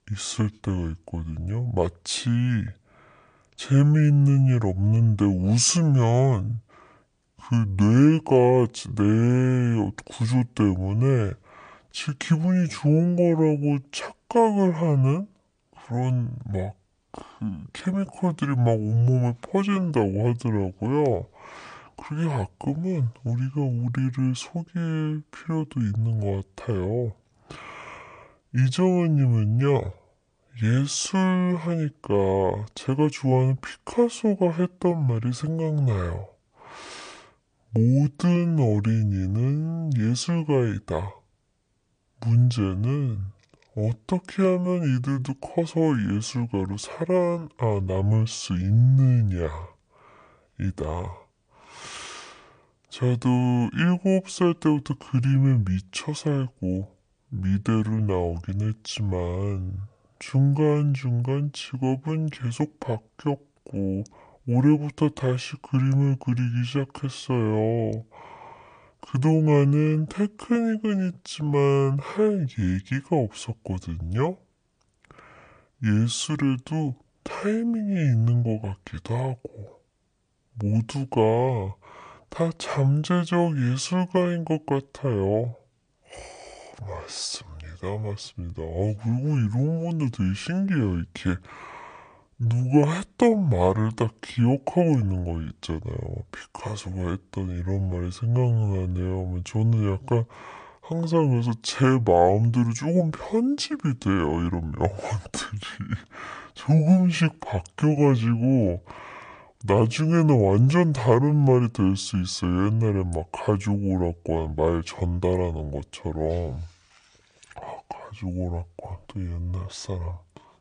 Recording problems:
wrong speed and pitch; too slow and too low; 0.6 times normal speed

